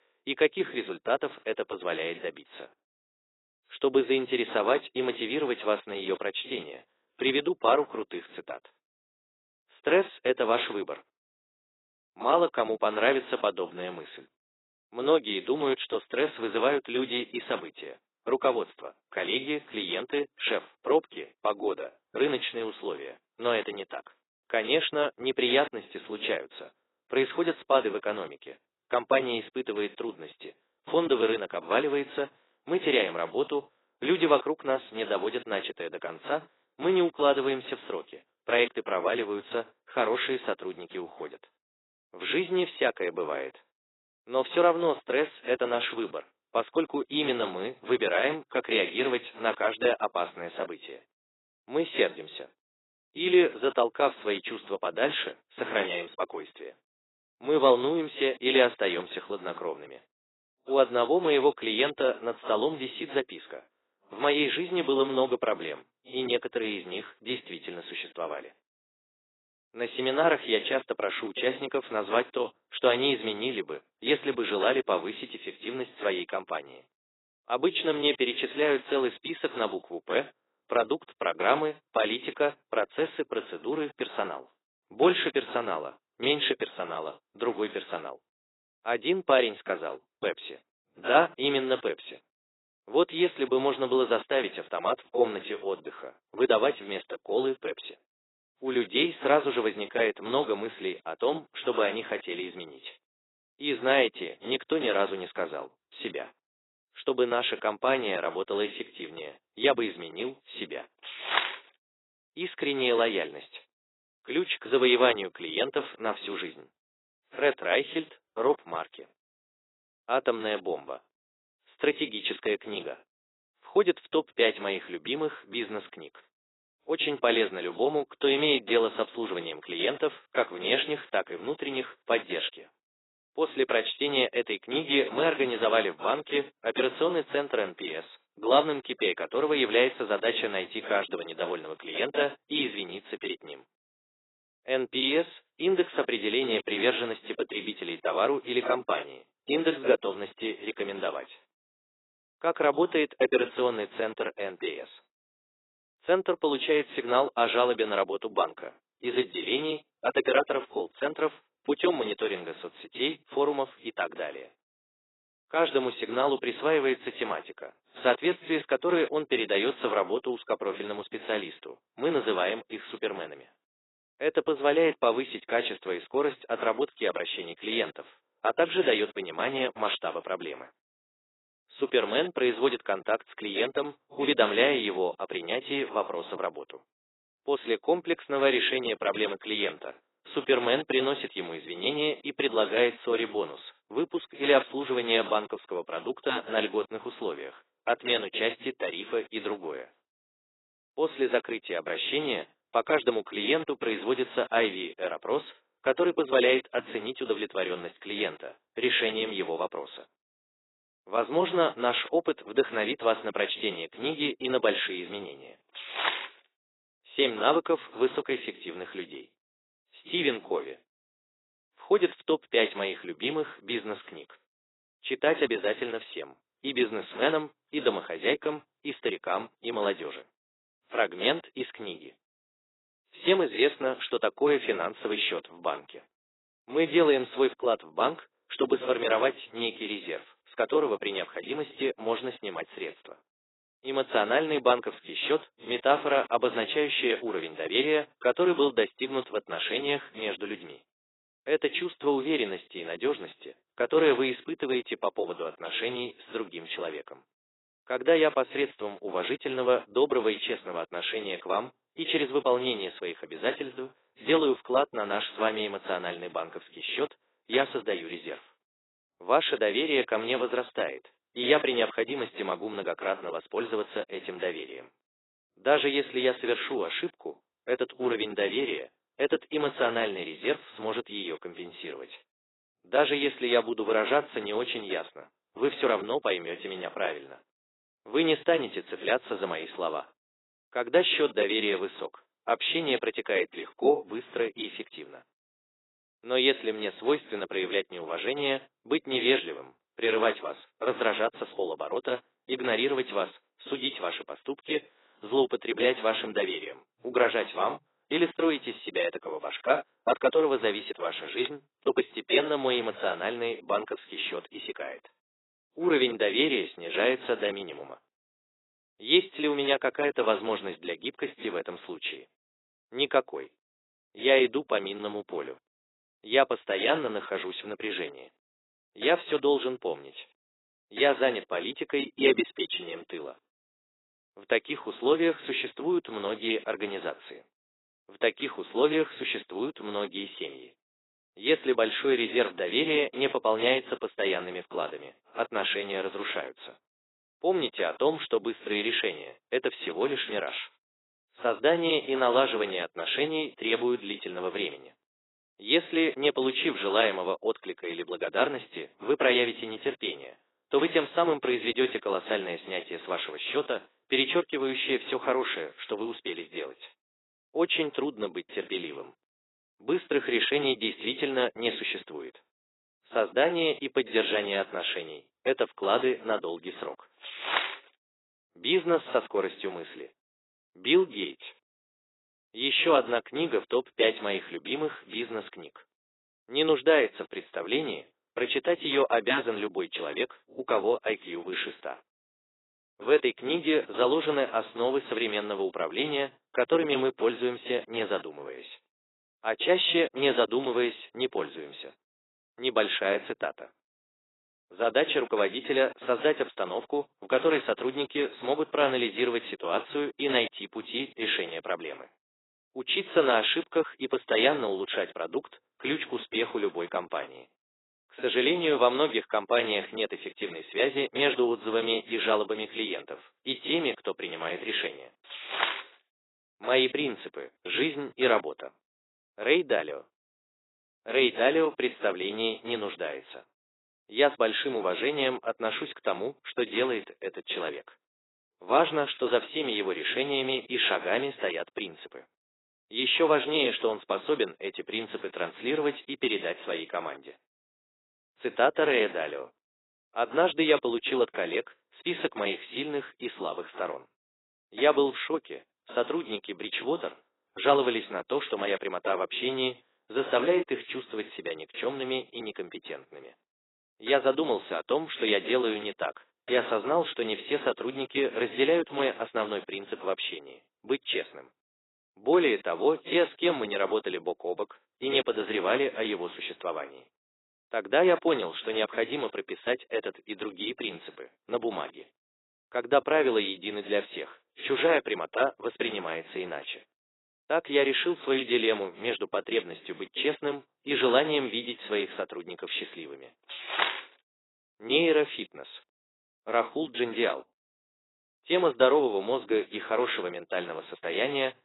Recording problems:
garbled, watery; badly; nothing above 4 kHz
thin; somewhat; fading below 350 Hz

